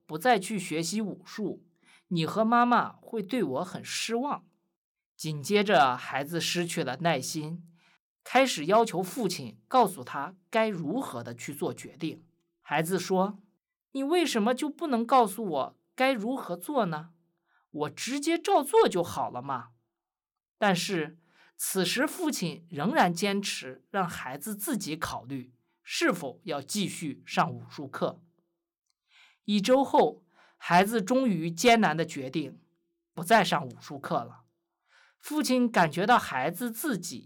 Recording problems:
none

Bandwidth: 18.5 kHz